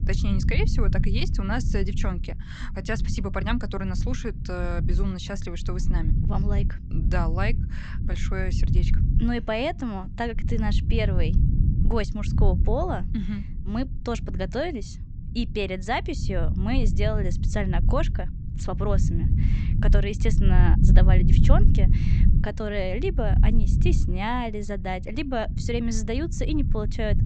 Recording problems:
high frequencies cut off; noticeable; nothing above 8 kHz
low rumble; loud; throughout; 8 dB below the speech

